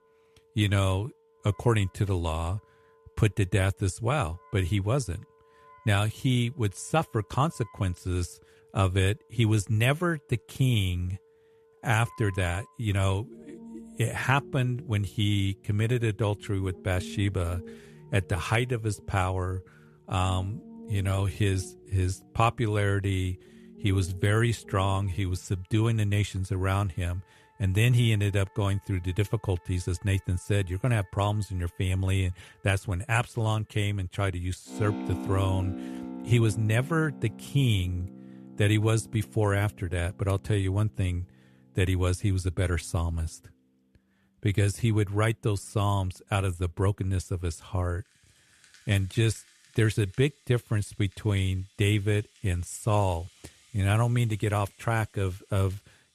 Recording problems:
background music; noticeable; throughout; 20 dB below the speech

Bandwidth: 13.5 kHz